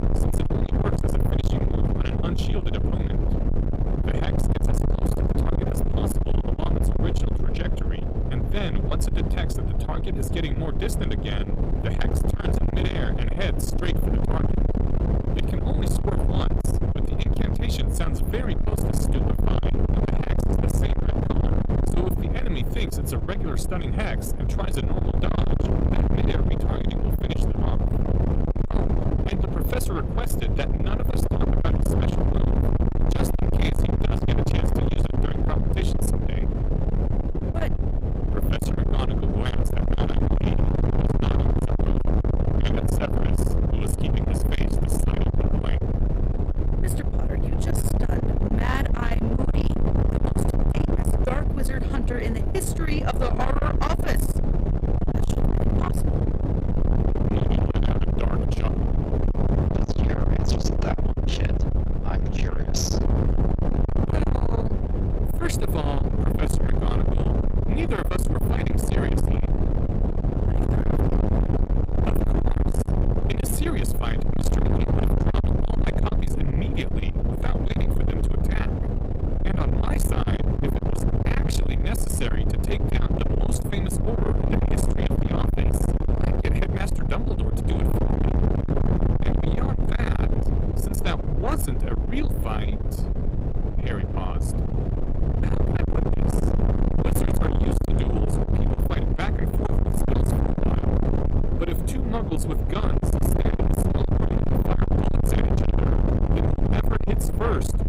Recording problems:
distortion; heavy; 8 dB below the speech
wind noise on the microphone; heavy; as loud as the speech

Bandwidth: 15.5 kHz